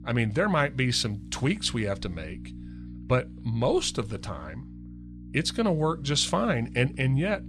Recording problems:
electrical hum; faint; throughout; 60 Hz, 25 dB below the speech

